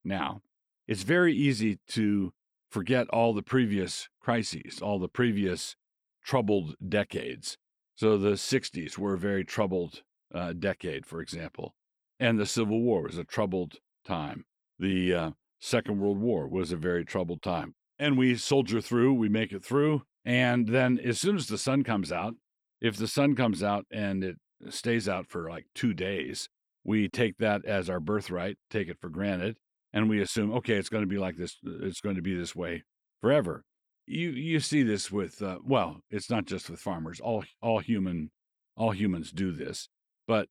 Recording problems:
none

